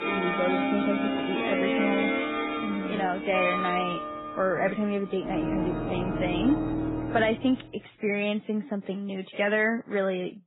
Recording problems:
garbled, watery; badly; nothing above 3.5 kHz
background music; loud; until 7 s; as loud as the speech

